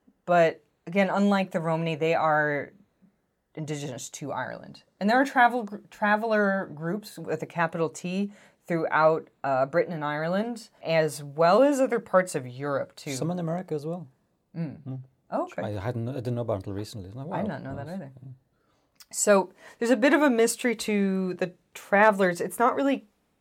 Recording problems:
none

